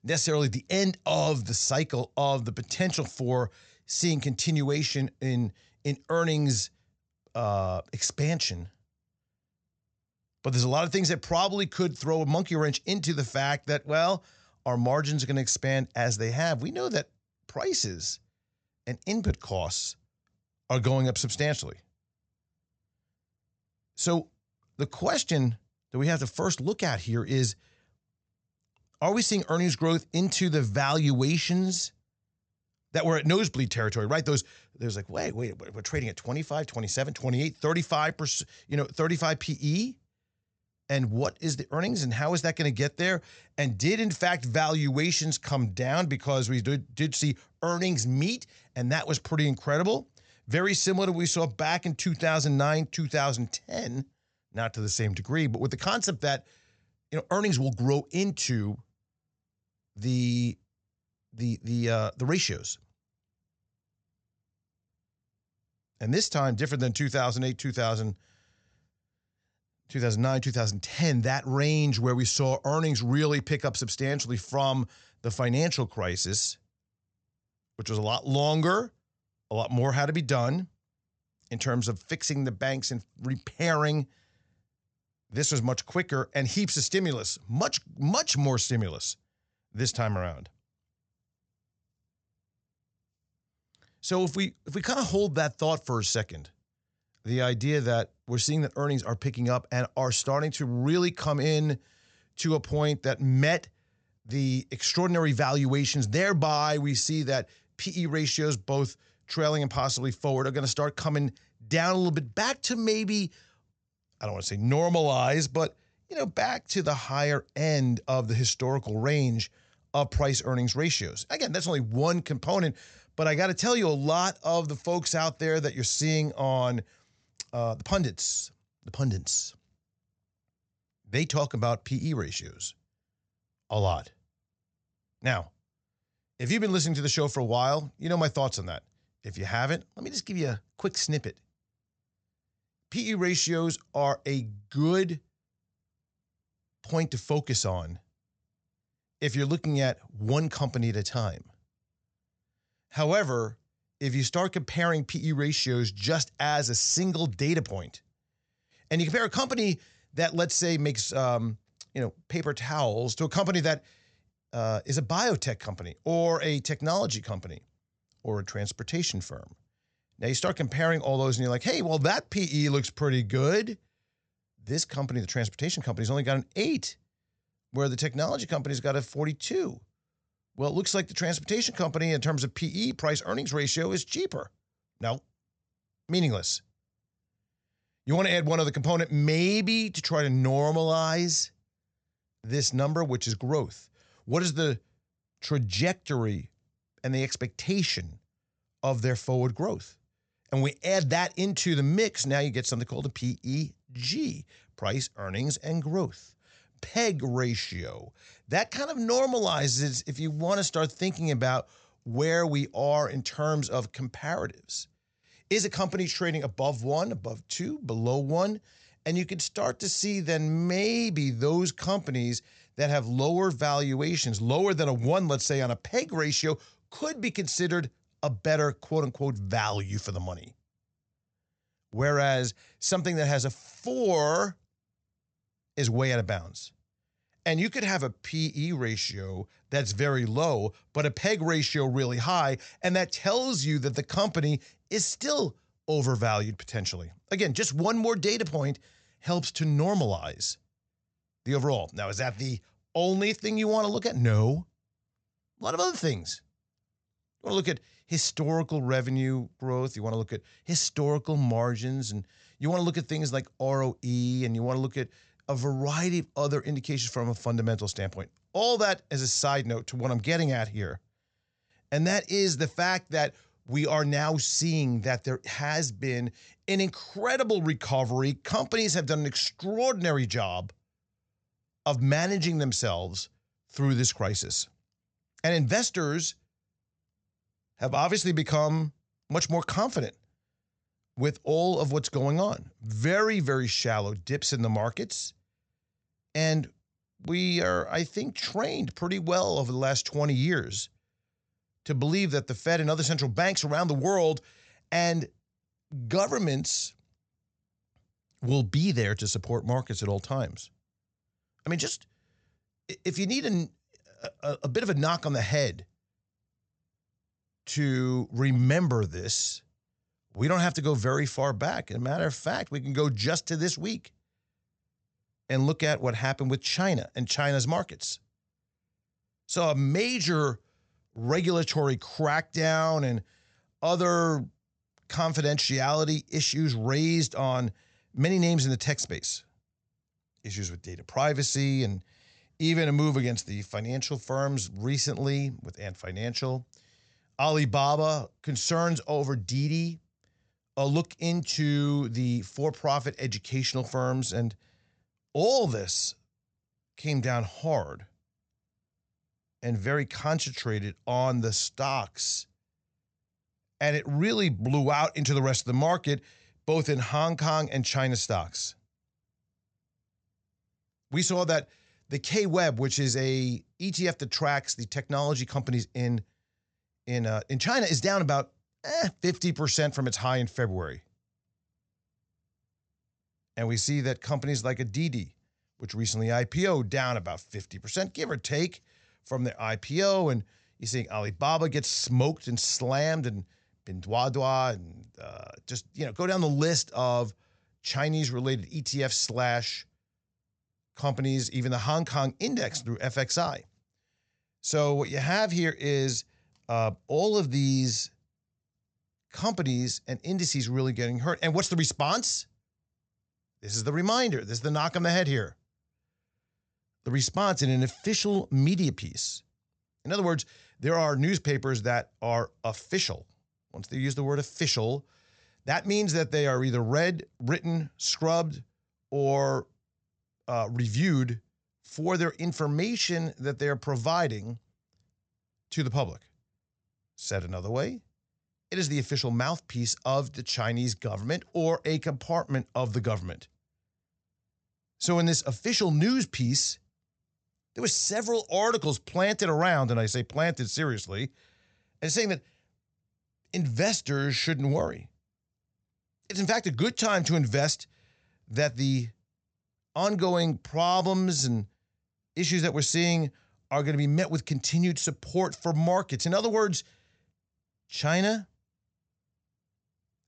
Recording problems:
high frequencies cut off; noticeable; nothing above 8 kHz

